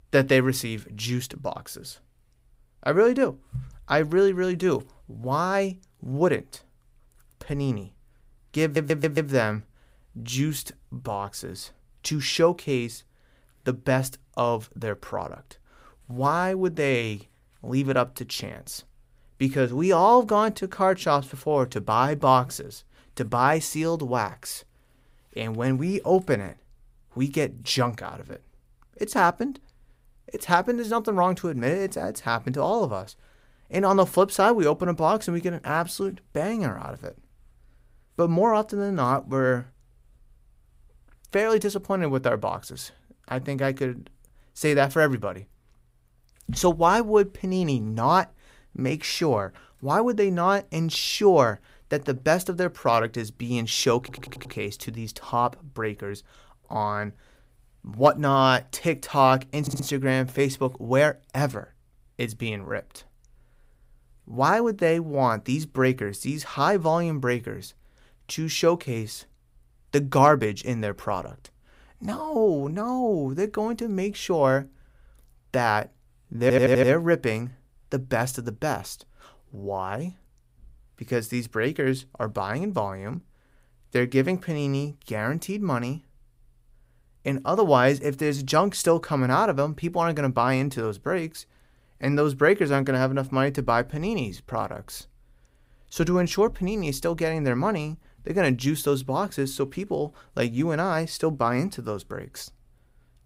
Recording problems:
audio stuttering; 4 times, first at 8.5 s

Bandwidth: 15.5 kHz